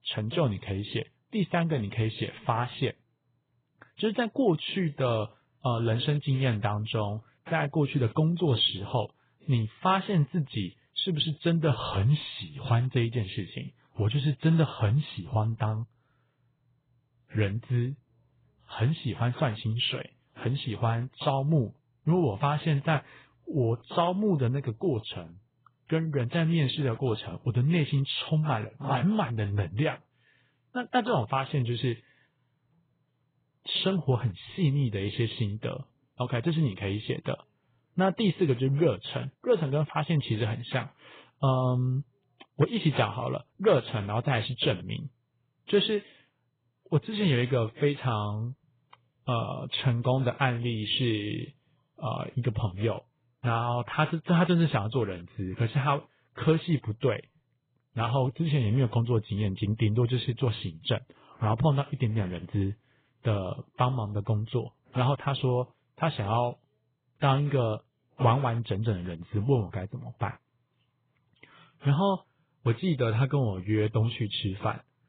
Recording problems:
garbled, watery; badly; nothing above 4 kHz

